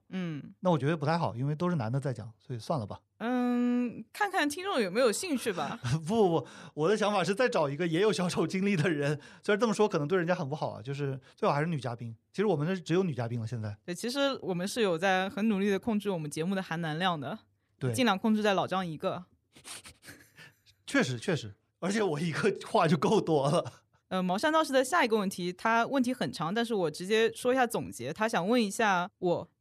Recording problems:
none

